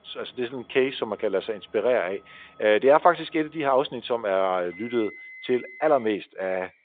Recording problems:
phone-call audio; nothing above 3.5 kHz
traffic noise; faint; throughout; 20 dB below the speech

